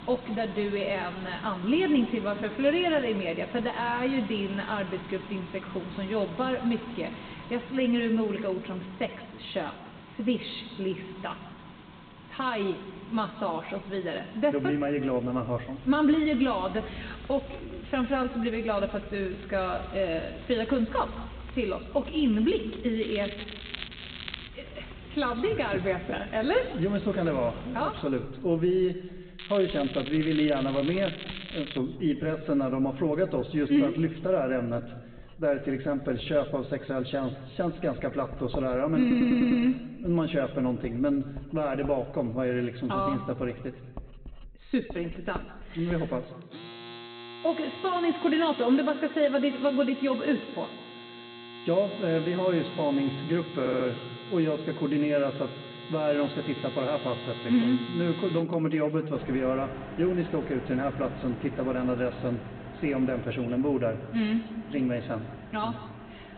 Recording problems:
high frequencies cut off; severe; nothing above 4 kHz
room echo; slight; dies away in 1.3 s
off-mic speech; somewhat distant
household noises; noticeable; throughout; 15 dB below the speech
crackling; noticeable; from 23 to 24 s and from 29 to 32 s; 10 dB below the speech
audio stuttering; at 39 s and at 54 s

